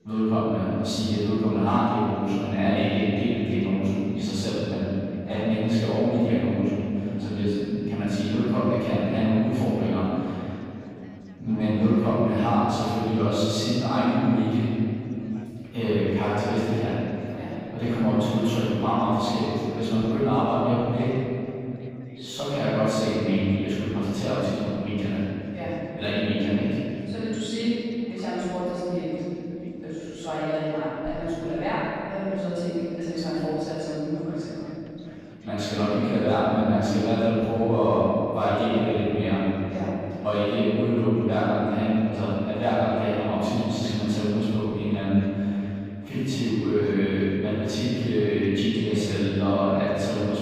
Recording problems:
room echo; strong; dies away in 2.7 s
off-mic speech; far
background chatter; faint; throughout; 3 voices, 25 dB below the speech

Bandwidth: 15 kHz